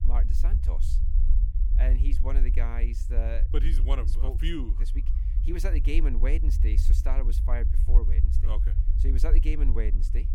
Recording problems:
low rumble; loud; throughout; 8 dB below the speech

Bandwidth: 18 kHz